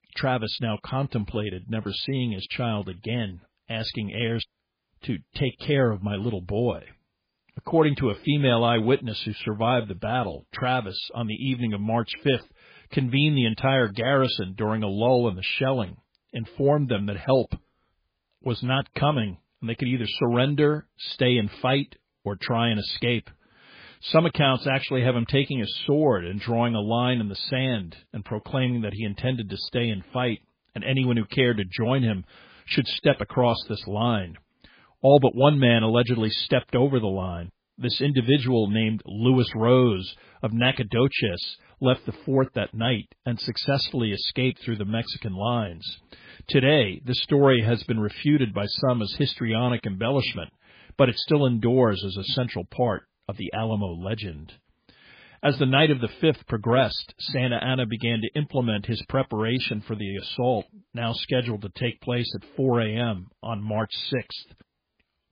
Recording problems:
garbled, watery; badly; nothing above 4.5 kHz

